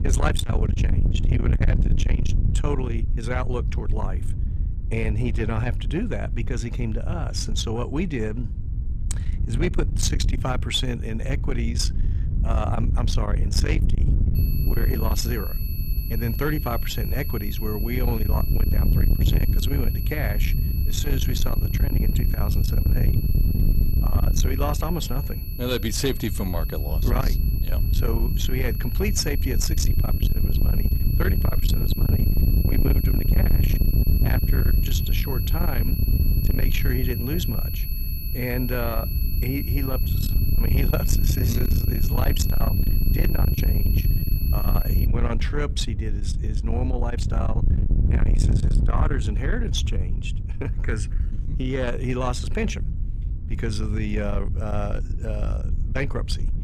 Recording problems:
distortion; heavy; 7 dB below the speech
wind noise on the microphone; heavy; 7 dB below the speech
high-pitched whine; loud; from 14 to 45 s; 11.5 kHz, 7 dB below the speech

